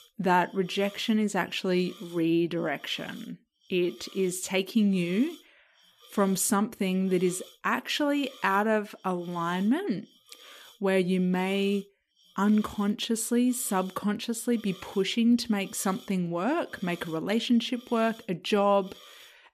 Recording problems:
hiss; faint; throughout; 25 dB below the speech

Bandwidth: 14.5 kHz